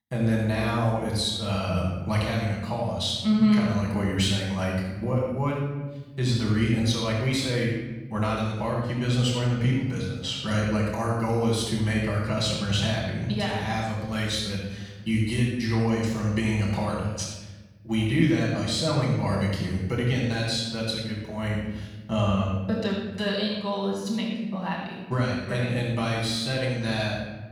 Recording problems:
off-mic speech; far
room echo; noticeable; dies away in 1.2 s

